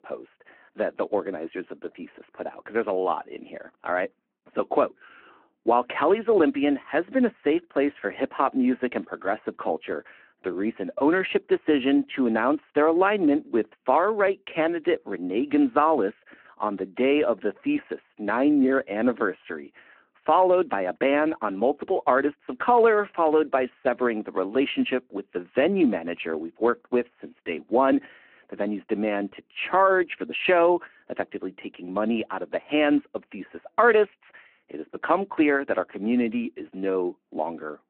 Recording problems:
phone-call audio

